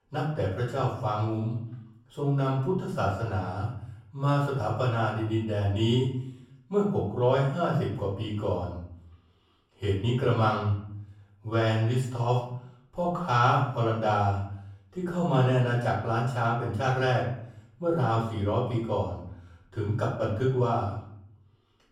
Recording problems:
off-mic speech; far
room echo; noticeable; dies away in 0.6 s

